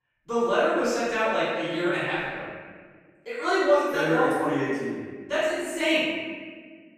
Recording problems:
room echo; strong; dies away in 1.5 s
off-mic speech; far

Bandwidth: 14.5 kHz